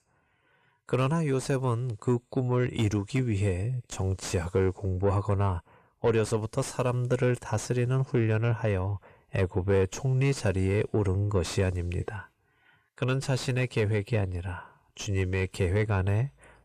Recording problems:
distortion; slight; 10 dB below the speech

